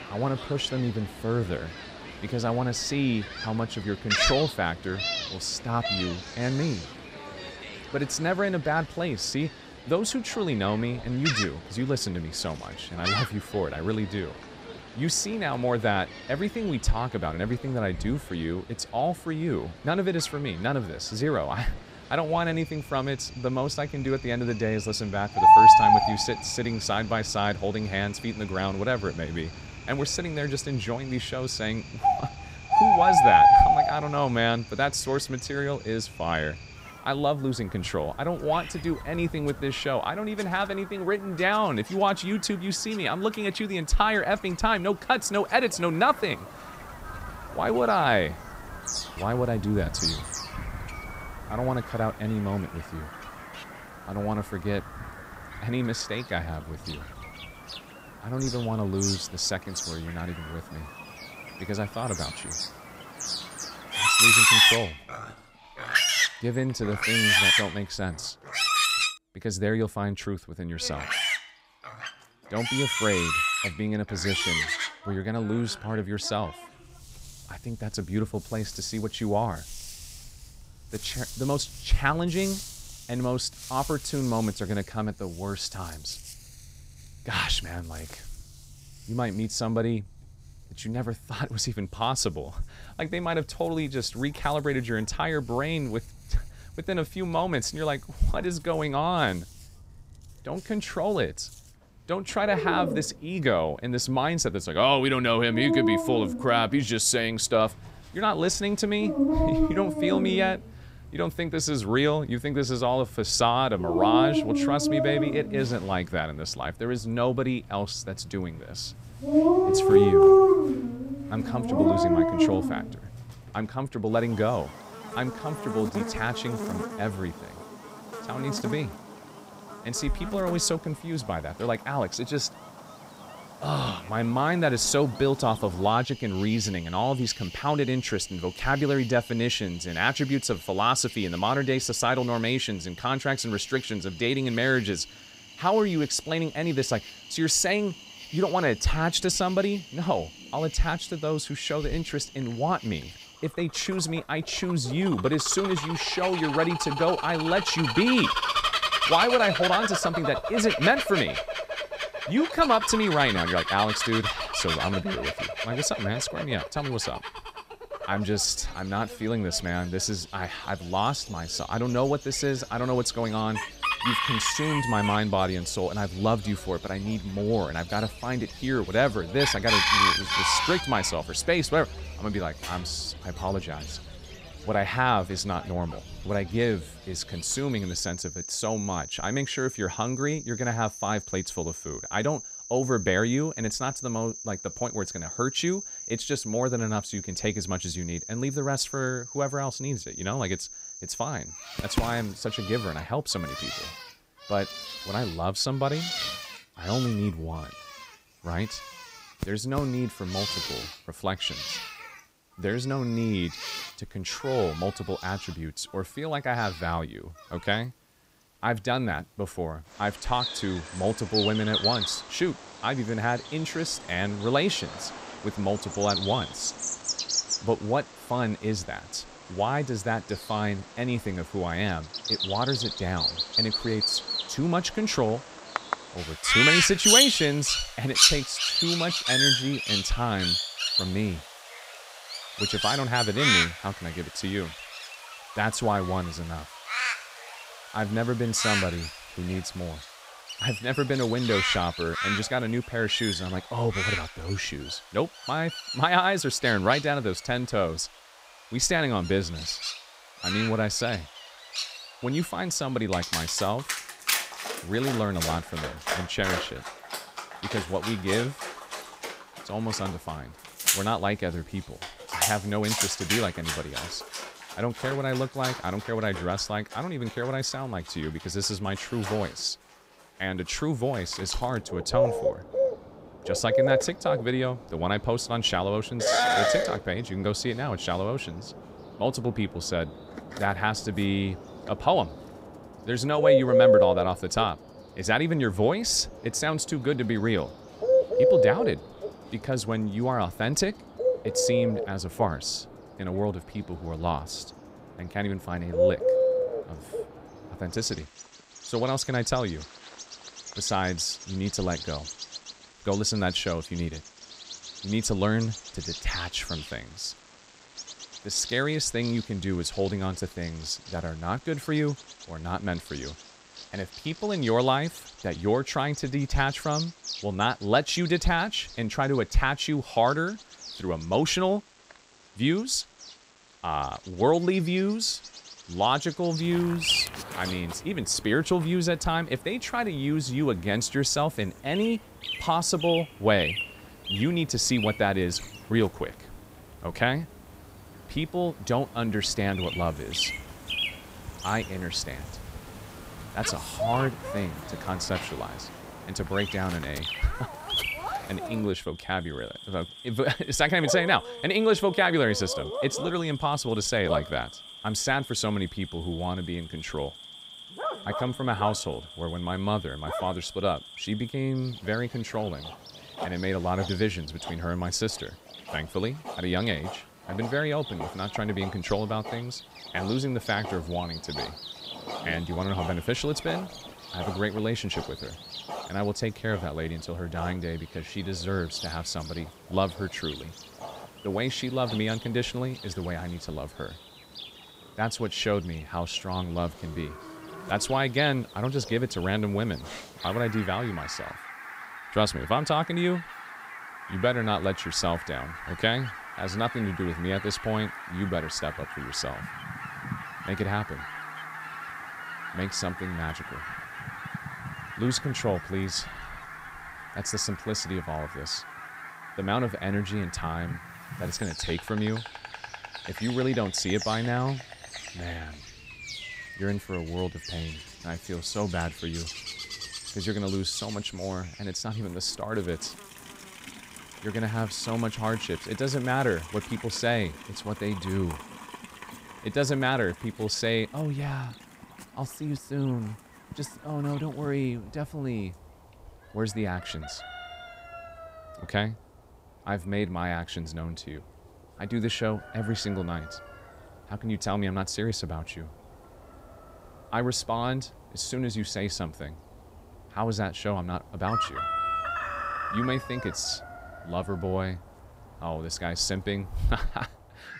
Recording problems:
animal sounds; very loud; throughout; as loud as the speech

